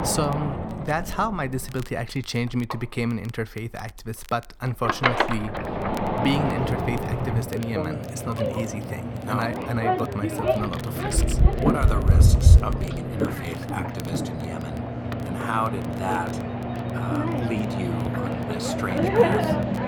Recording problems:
household noises; very loud; throughout; 5 dB above the speech
crackle, like an old record; faint; 20 dB below the speech

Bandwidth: 18 kHz